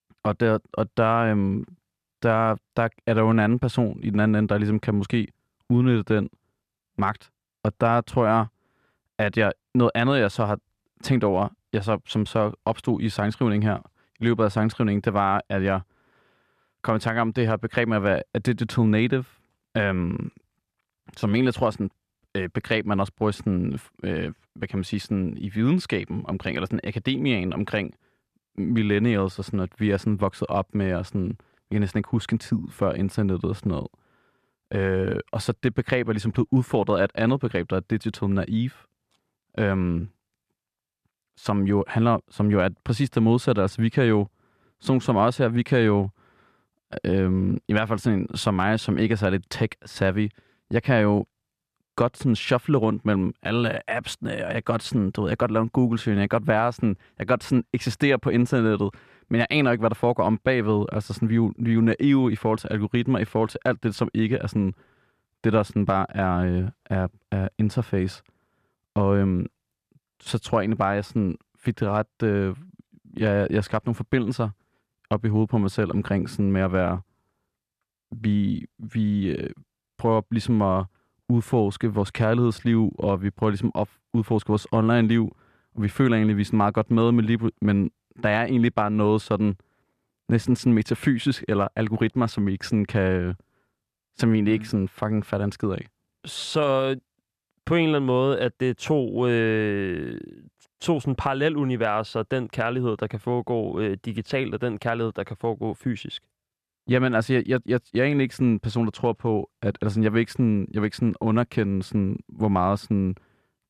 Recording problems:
none

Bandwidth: 14.5 kHz